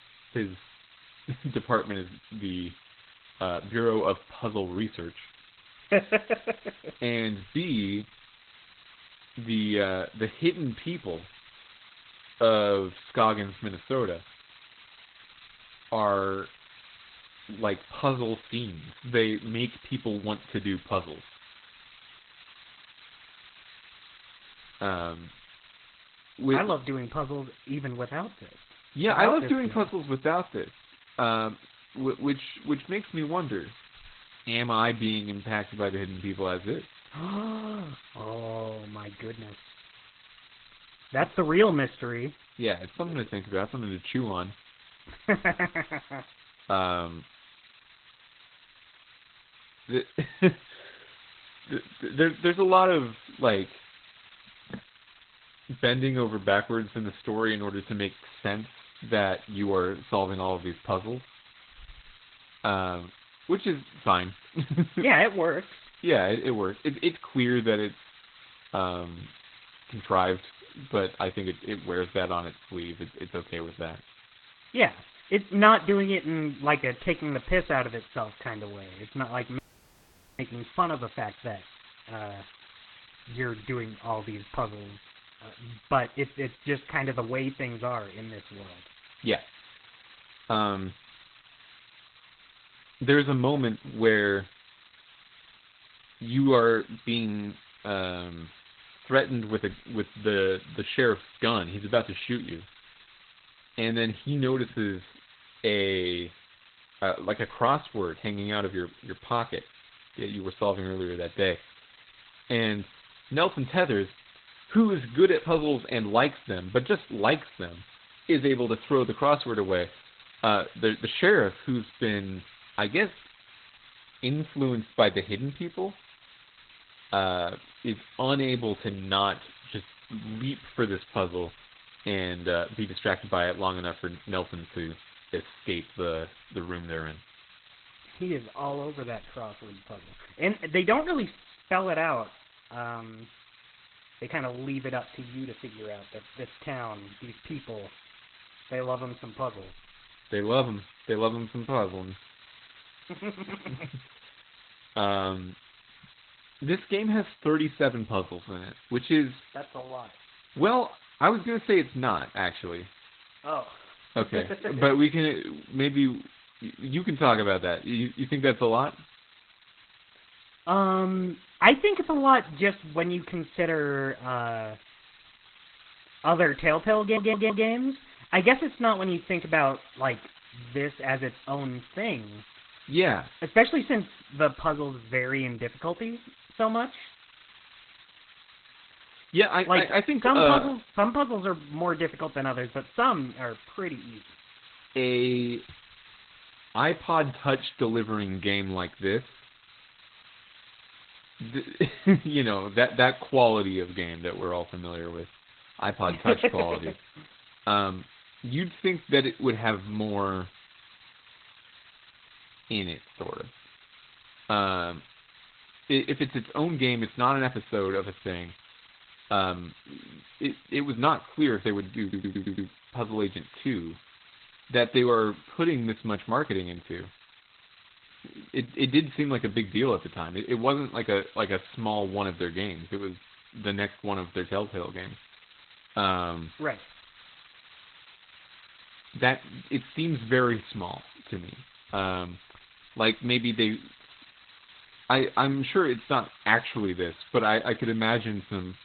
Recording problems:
garbled, watery; badly; nothing above 4 kHz
hiss; faint; throughout; 25 dB below the speech
audio cutting out; at 1:20 for 1 s
audio stuttering; at 2:57 and at 3:42

